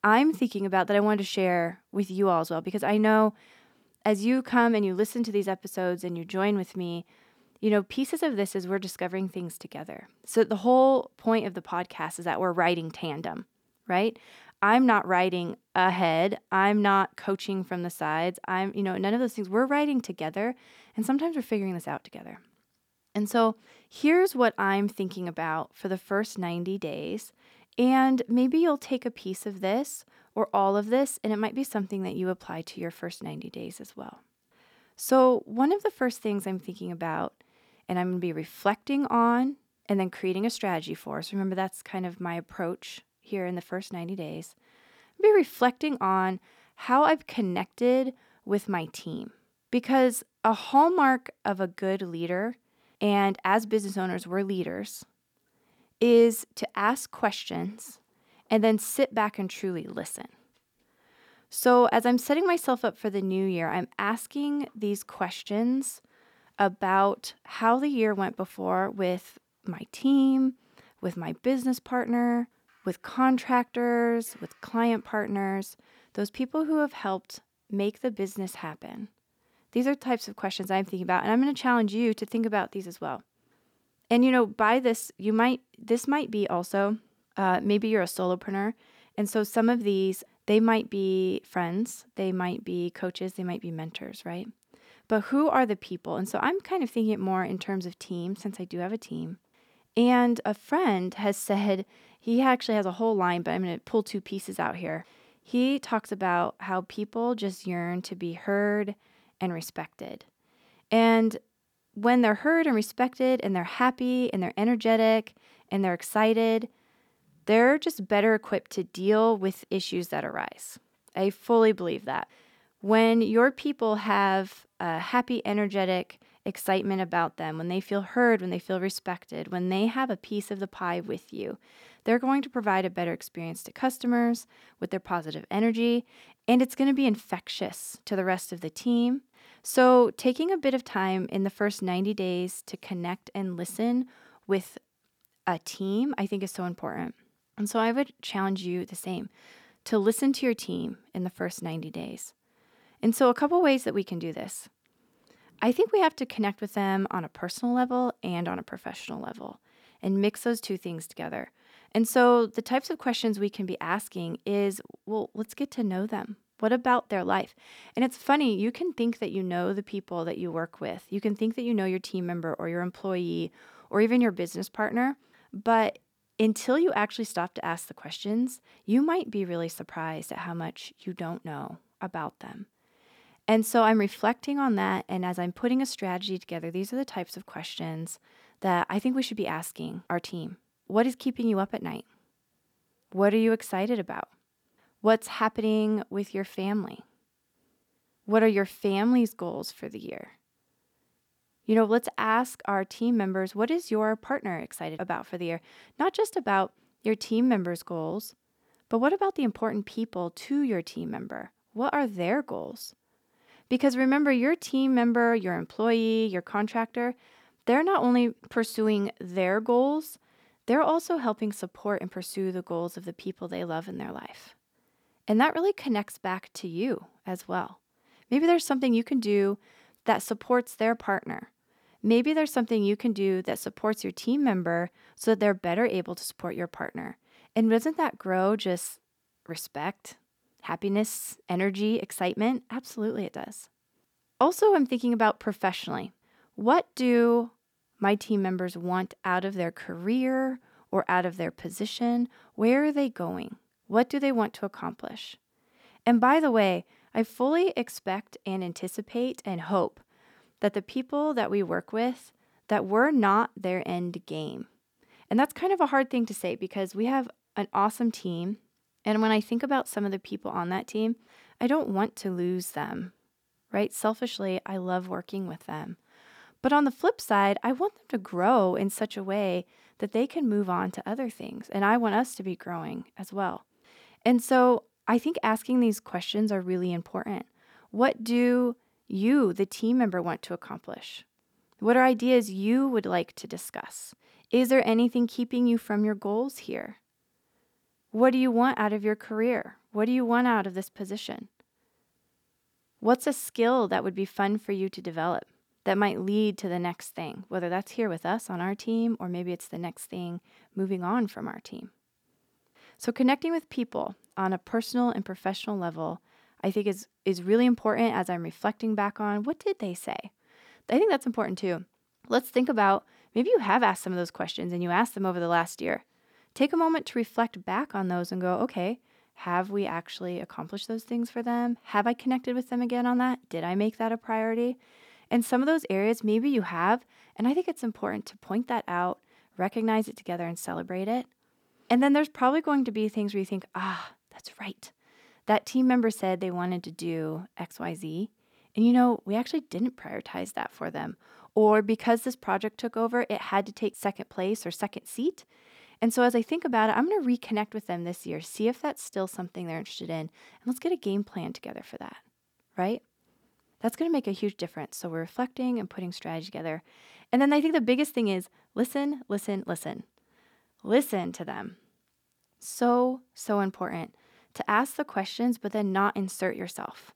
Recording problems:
none

